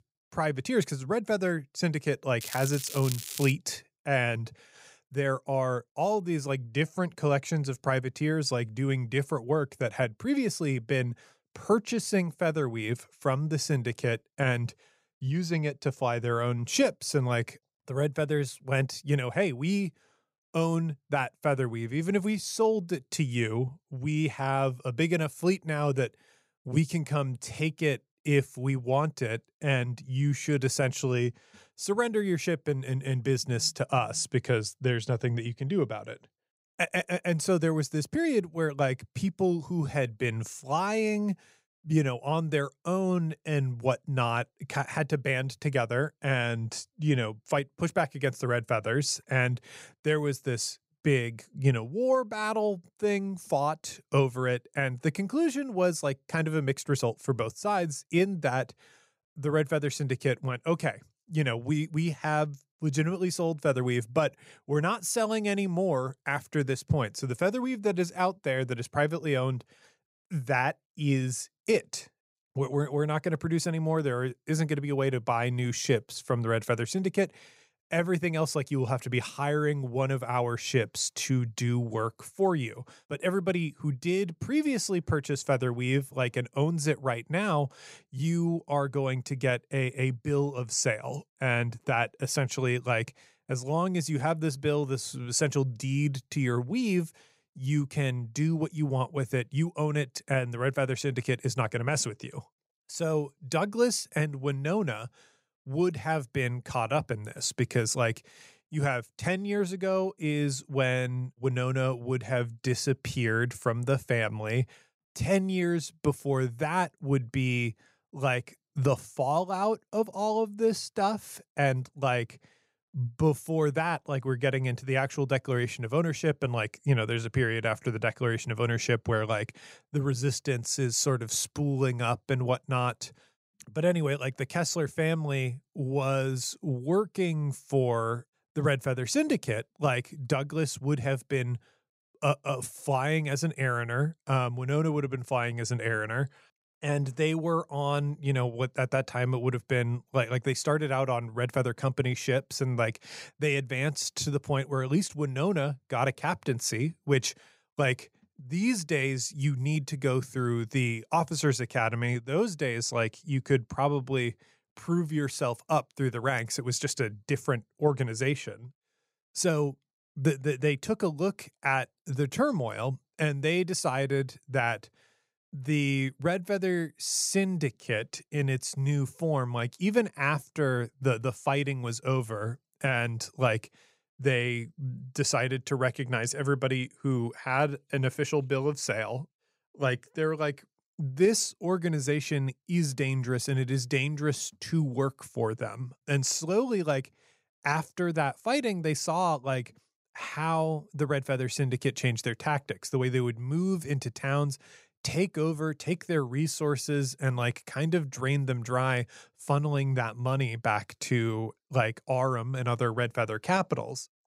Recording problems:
crackling; loud; from 2.5 to 3.5 s; 9 dB below the speech

